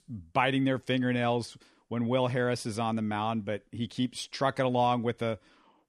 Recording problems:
none

